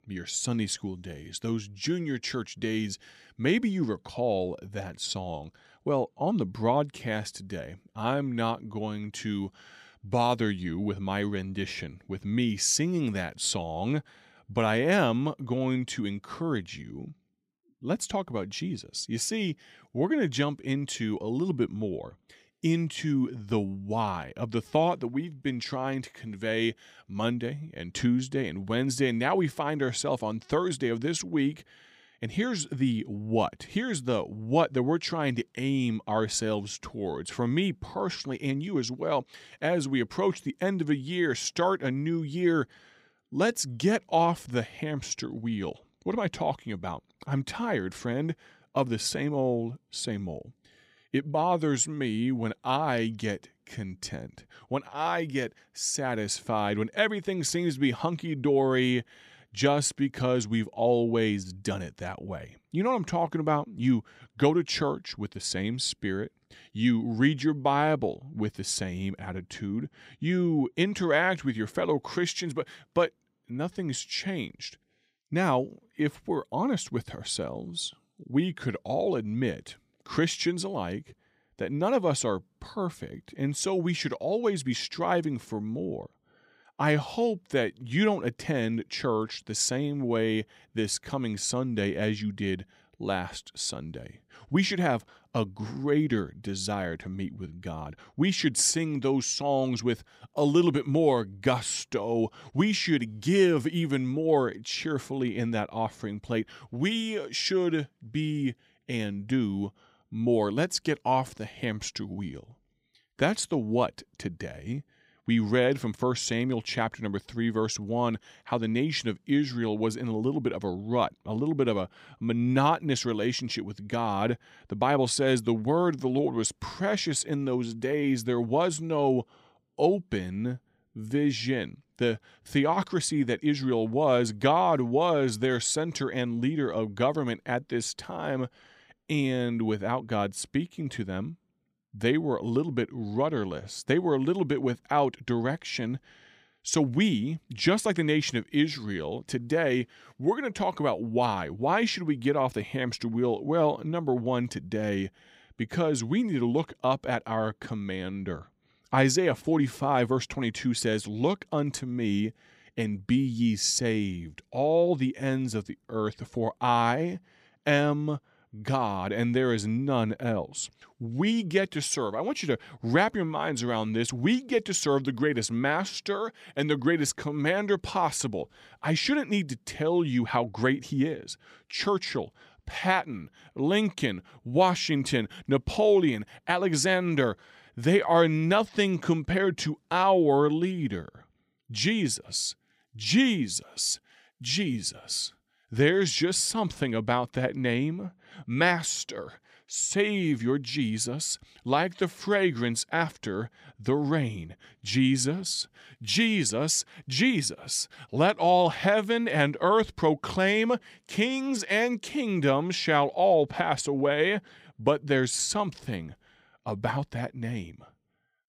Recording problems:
none

